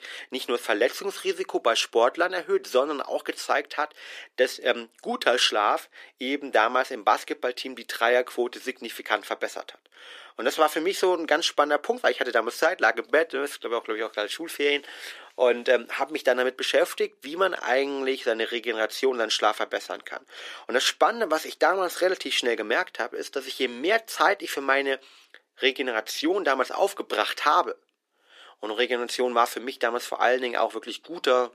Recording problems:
thin; very; fading below 350 Hz

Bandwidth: 14.5 kHz